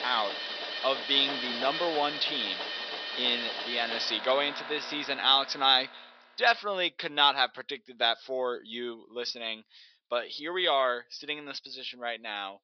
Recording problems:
thin; very; fading below 500 Hz
high frequencies cut off; noticeable; nothing above 5.5 kHz
machinery noise; loud; until 6 s; 6 dB below the speech

